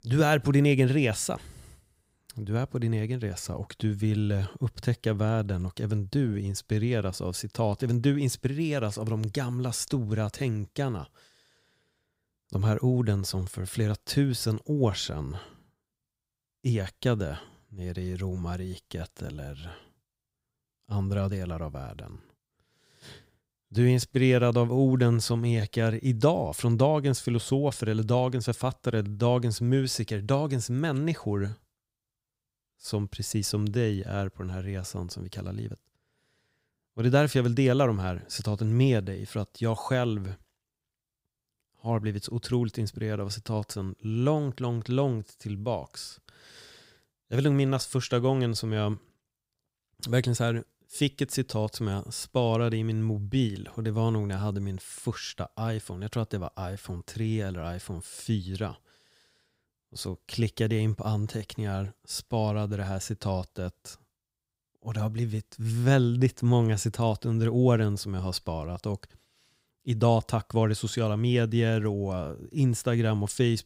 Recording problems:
none

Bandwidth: 15.5 kHz